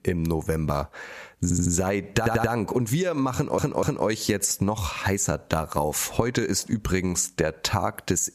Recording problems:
squashed, flat; heavily
audio stuttering; at 1.5 s, at 2 s and at 3.5 s

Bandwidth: 14.5 kHz